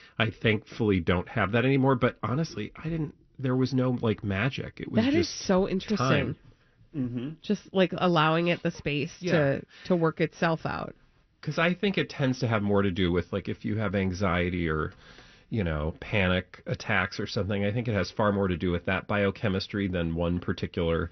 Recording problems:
high frequencies cut off; noticeable; nothing above 6 kHz

